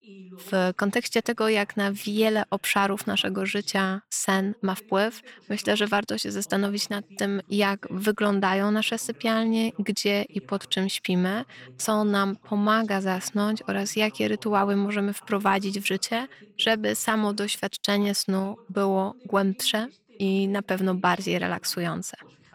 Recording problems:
voice in the background; faint; throughout; 25 dB below the speech

